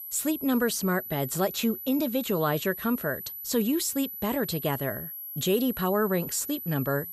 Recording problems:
high-pitched whine; loud; throughout; 12 kHz, 8 dB below the speech

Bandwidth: 15.5 kHz